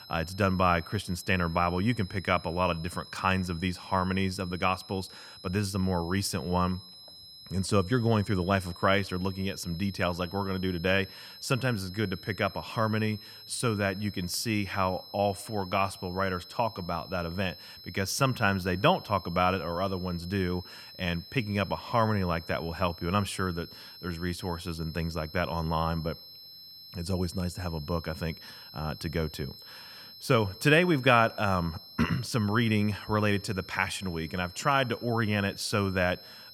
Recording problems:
high-pitched whine; noticeable; throughout; 5 kHz, 15 dB below the speech

